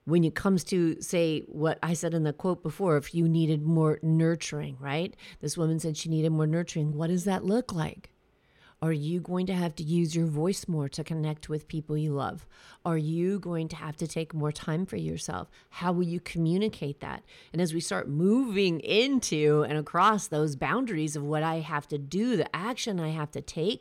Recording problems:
none

